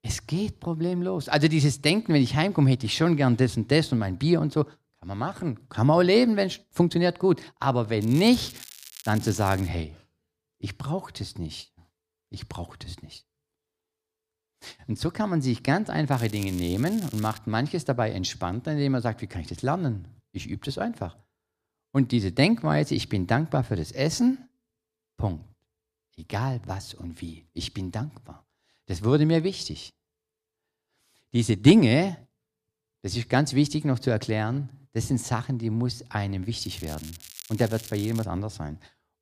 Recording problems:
crackling; noticeable; from 8 to 9.5 s, from 16 to 17 s and from 37 to 38 s; 15 dB below the speech

